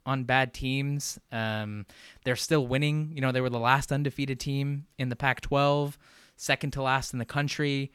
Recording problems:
none

